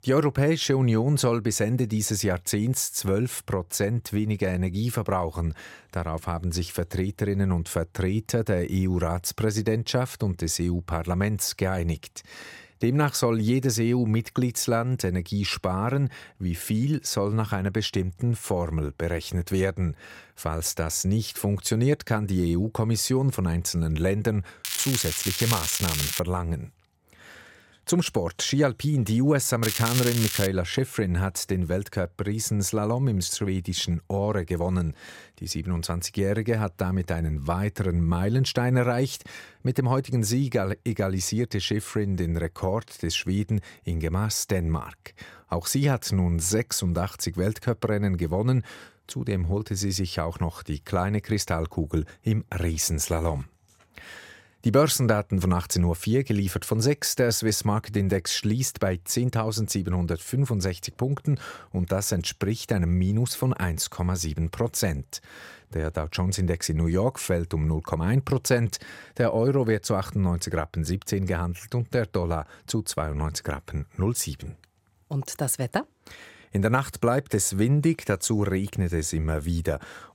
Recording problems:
crackling; loud; from 25 to 26 s and at 30 s; 2 dB below the speech

